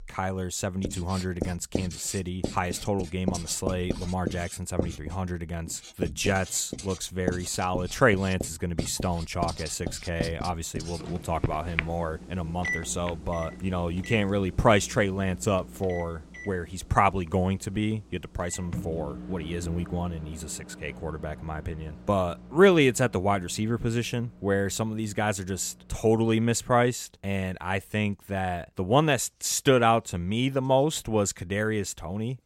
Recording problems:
household noises; loud; throughout; 10 dB below the speech

